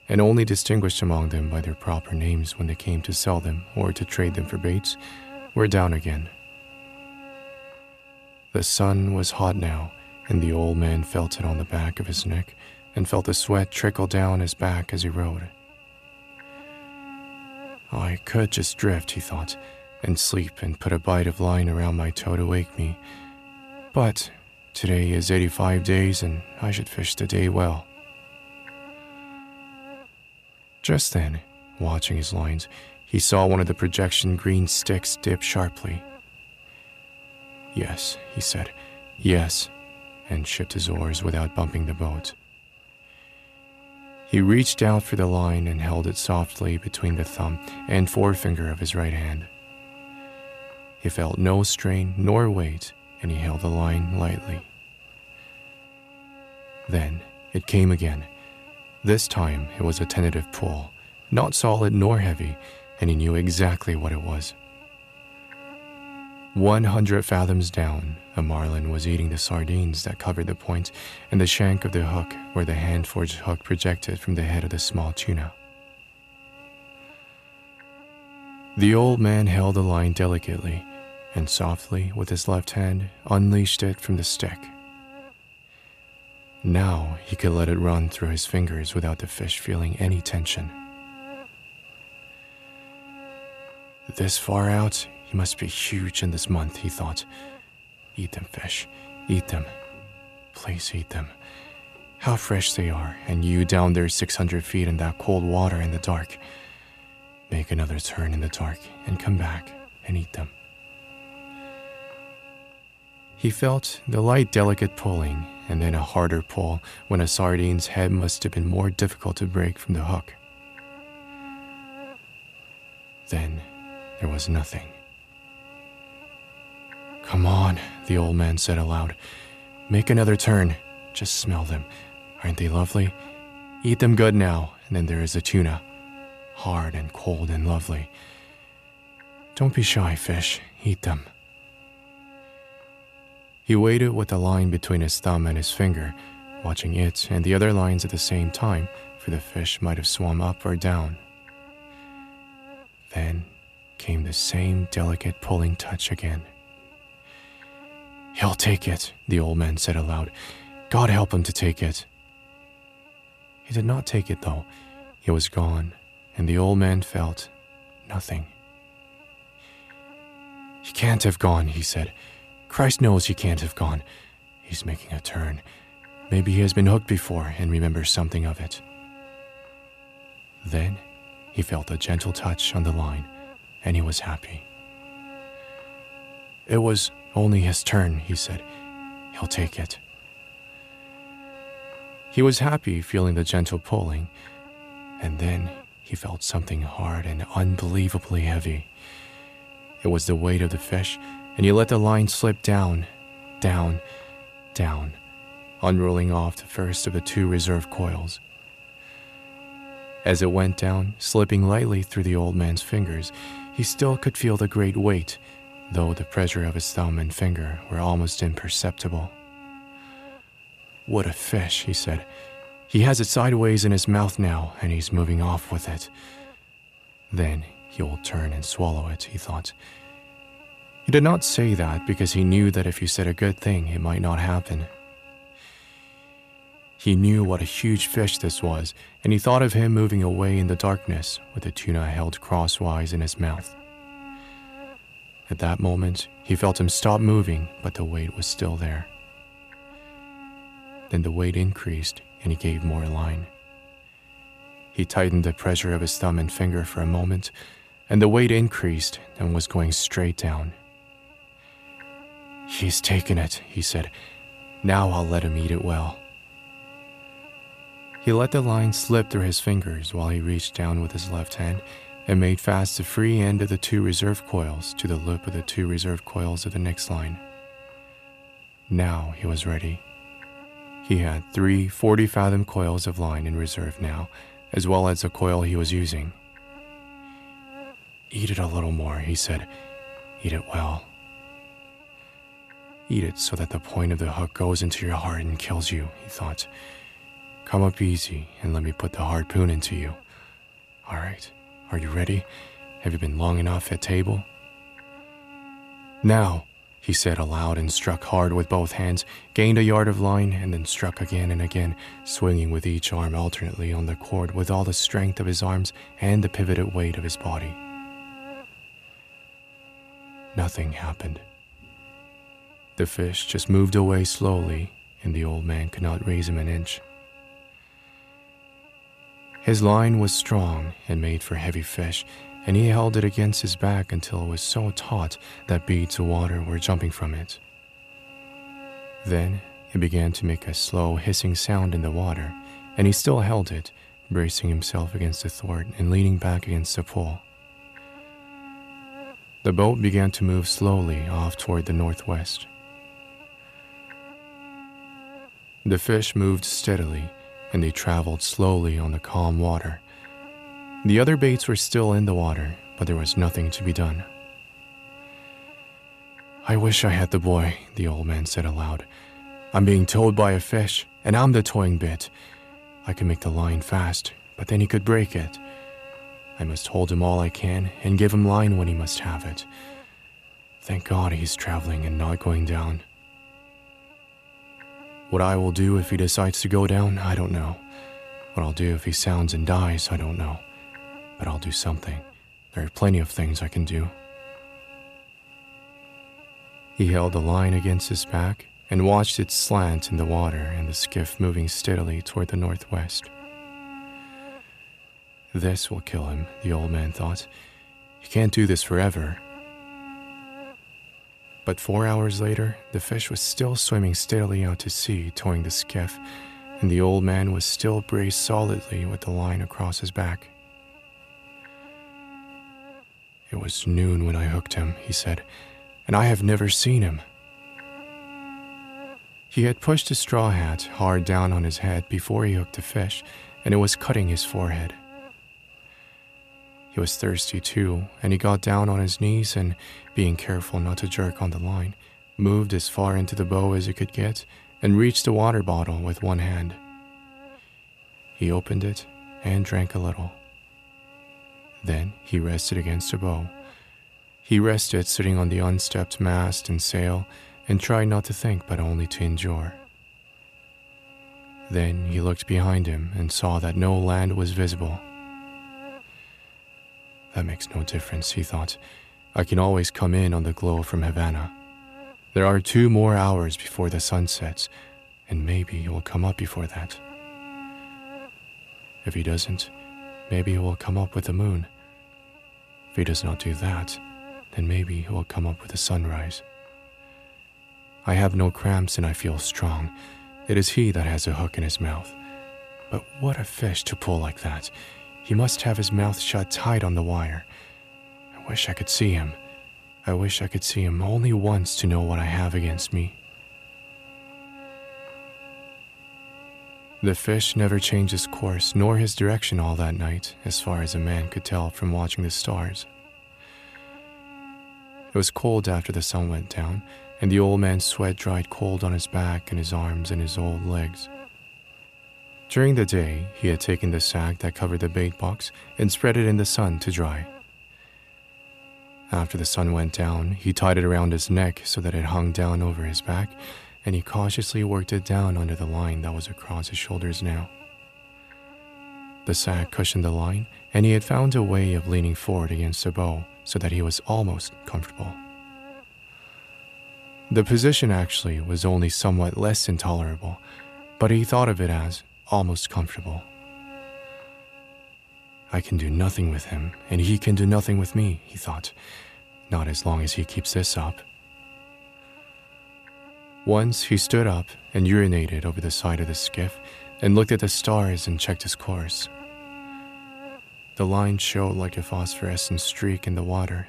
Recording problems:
electrical hum; noticeable; throughout; 50 Hz, 15 dB below the speech

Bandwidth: 14.5 kHz